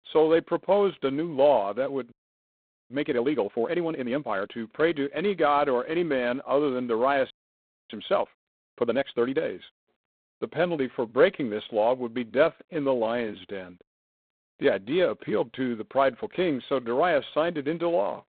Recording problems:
phone-call audio; poor line; nothing above 3.5 kHz
audio freezing; at 2 s for 1 s and at 7.5 s for 0.5 s

